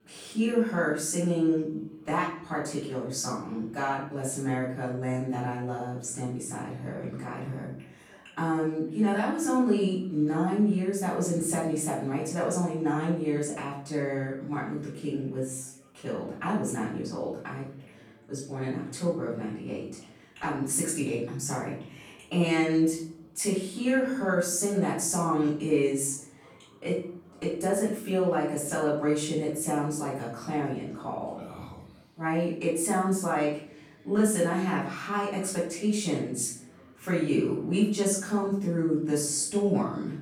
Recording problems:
off-mic speech; far
room echo; noticeable; dies away in 0.5 s
background chatter; faint; throughout; 4 voices, 30 dB below the speech

